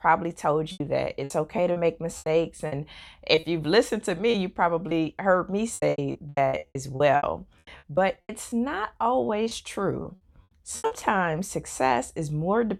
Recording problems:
choppy; very; from 0.5 to 3.5 s, from 4.5 to 8.5 s and from 9.5 to 11 s; 15% of the speech affected

